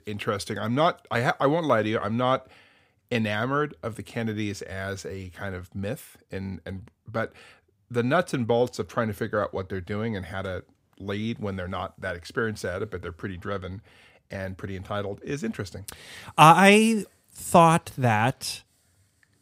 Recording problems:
none

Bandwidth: 15.5 kHz